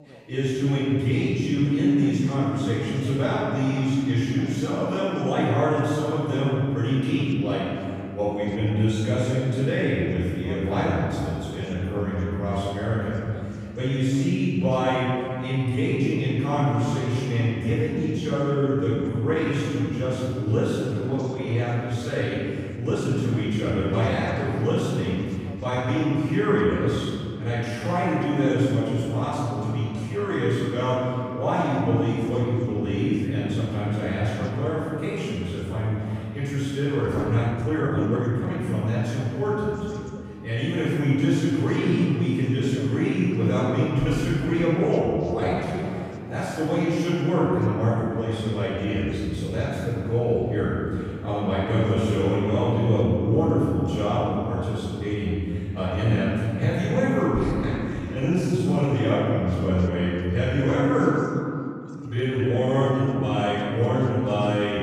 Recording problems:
room echo; strong; dies away in 2.3 s
off-mic speech; far
background chatter; faint; throughout; 2 voices, 20 dB below the speech
uneven, jittery; strongly; from 15 s to 1:03

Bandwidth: 15 kHz